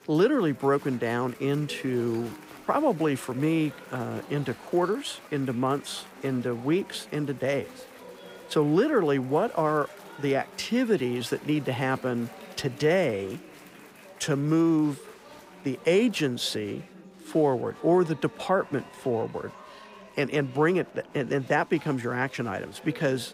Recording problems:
chatter from many people; noticeable; throughout; 20 dB below the speech

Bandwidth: 15.5 kHz